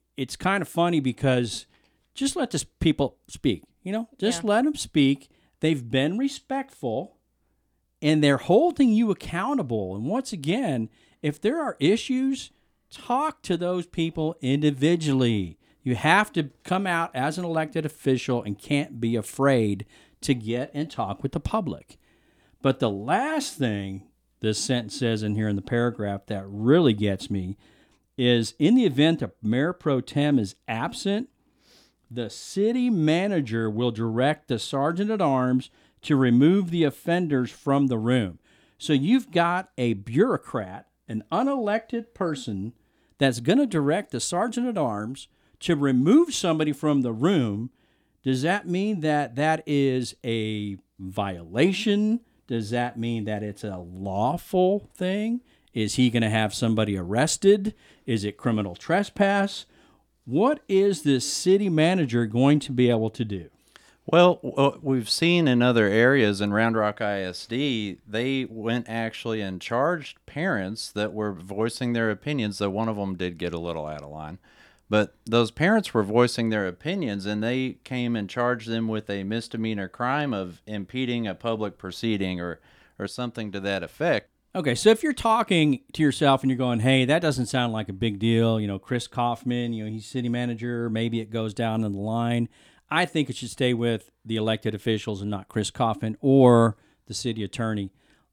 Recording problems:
none

